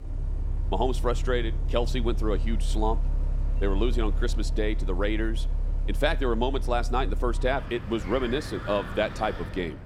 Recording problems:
traffic noise; loud; throughout; 2 dB below the speech

